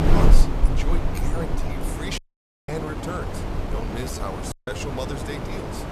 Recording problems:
wind noise on the microphone; heavy; 1 dB above the speech
uneven, jittery; strongly; from 0.5 to 5 s
audio cutting out; at 2 s for 0.5 s and at 4.5 s

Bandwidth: 14.5 kHz